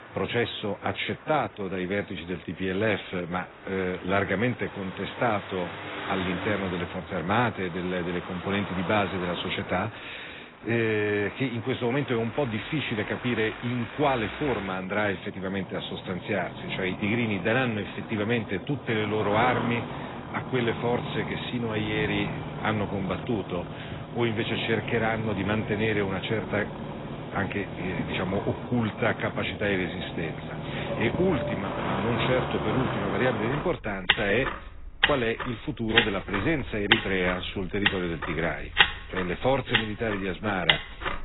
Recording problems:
garbled, watery; badly; nothing above 4 kHz
traffic noise; loud; throughout; 4 dB below the speech

